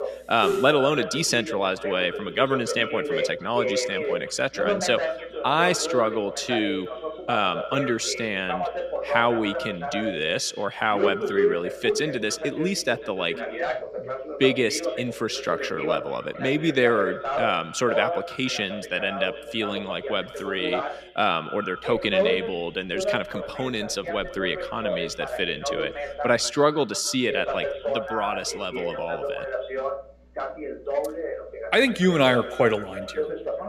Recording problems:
echo of what is said; noticeable; throughout; 140 ms later, 15 dB below the speech
voice in the background; loud; throughout; 5 dB below the speech

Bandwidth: 14.5 kHz